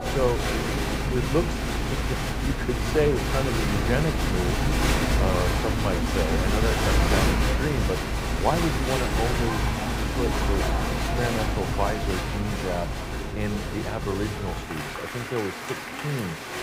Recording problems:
crowd noise; very loud; throughout; 3 dB above the speech

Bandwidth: 15.5 kHz